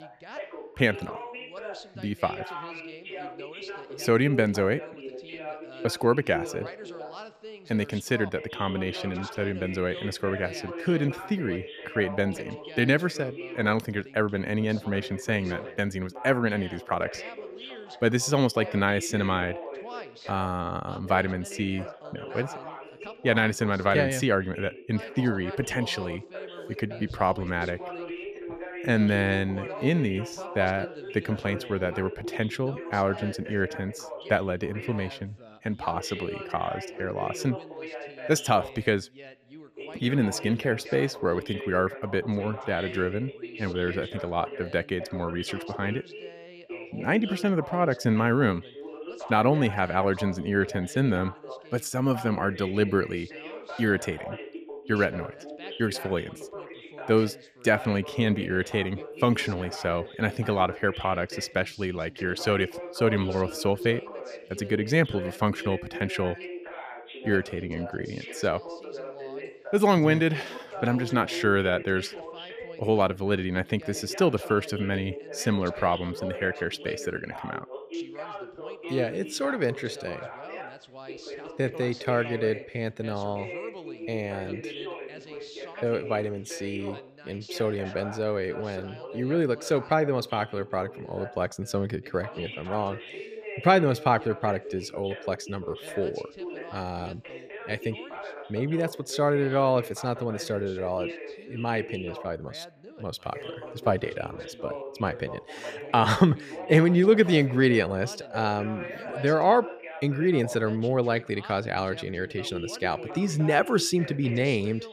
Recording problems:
background chatter; noticeable; throughout; 2 voices, 10 dB below the speech

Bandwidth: 14.5 kHz